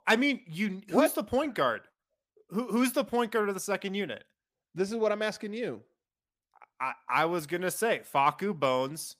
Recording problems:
none

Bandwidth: 15 kHz